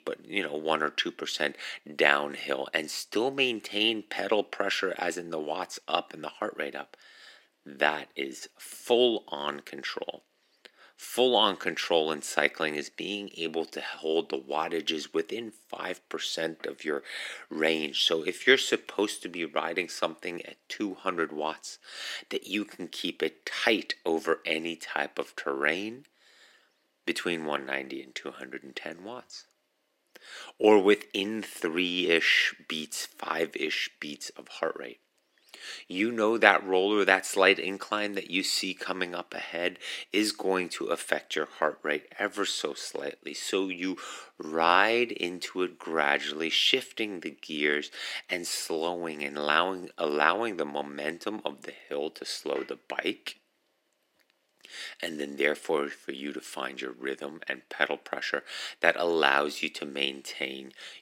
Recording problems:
thin; somewhat; fading below 250 Hz

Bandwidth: 16 kHz